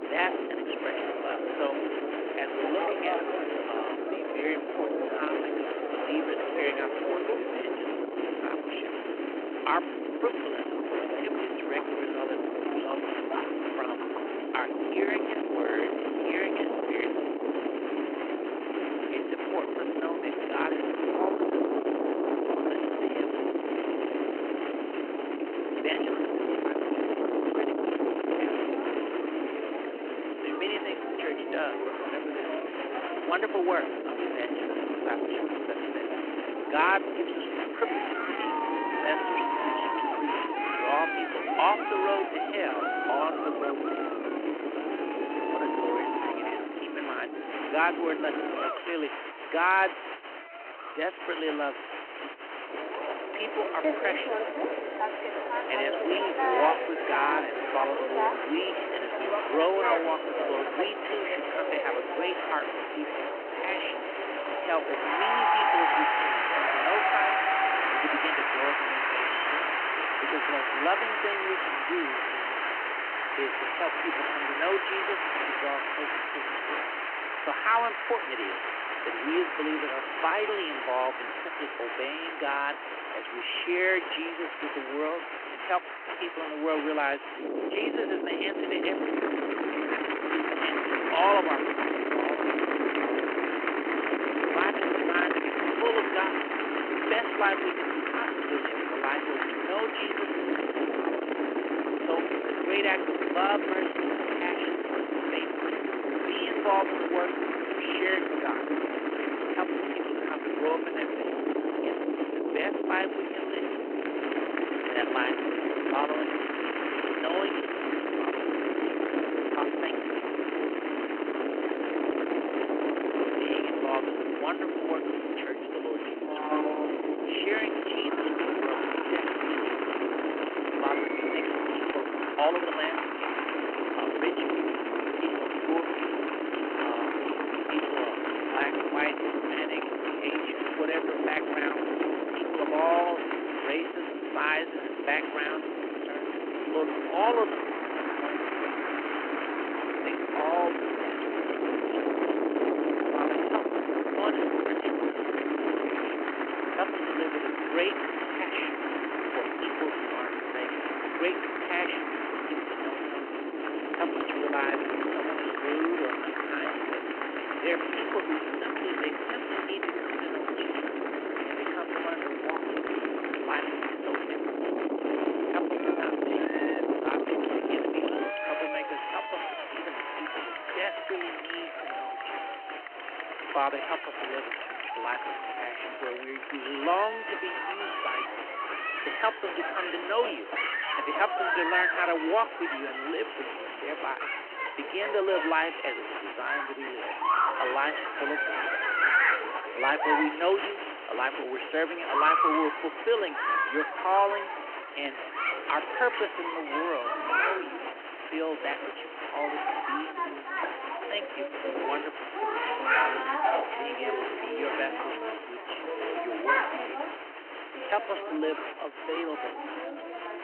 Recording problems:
phone-call audio
distortion; slight; 15 dB below the speech
wind noise on the microphone; heavy; until 49 s and from 1:27 to 2:58; 3 dB below the speech
crowd noise; loud; throughout; as loud as the speech
uneven, jittery; strongly; from 5 s to 3:36

